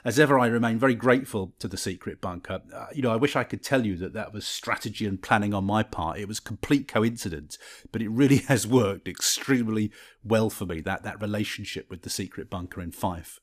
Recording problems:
none

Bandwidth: 14.5 kHz